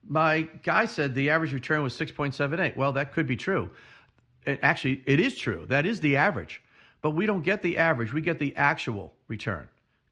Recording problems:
muffled; slightly; fading above 3 kHz

